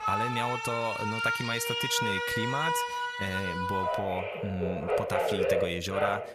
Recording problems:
alarms or sirens; very loud; throughout; 3 dB above the speech

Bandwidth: 14.5 kHz